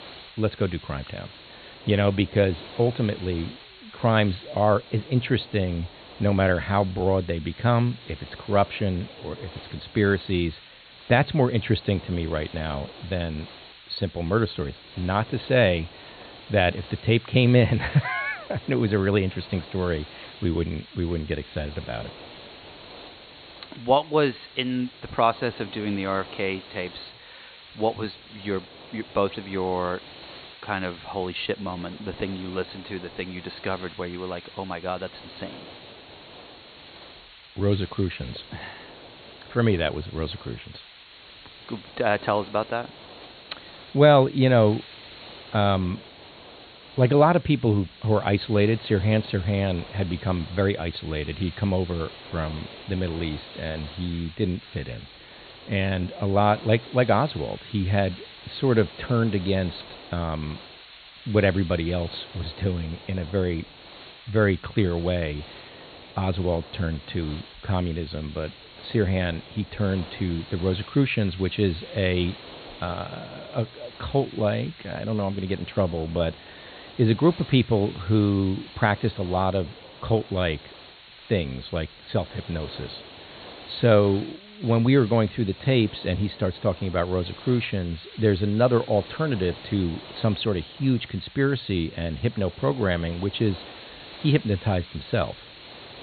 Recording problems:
high frequencies cut off; severe; nothing above 4.5 kHz
hiss; noticeable; throughout; 20 dB below the speech

